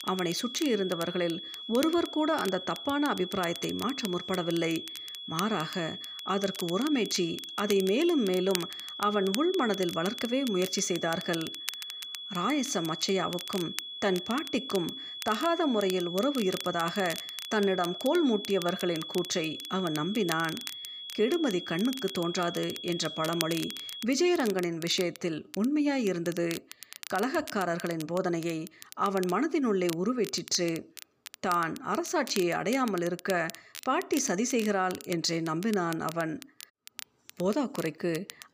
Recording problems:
high-pitched whine; loud; until 24 s; 3.5 kHz, 9 dB below the speech
crackle, like an old record; noticeable; 15 dB below the speech

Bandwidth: 15 kHz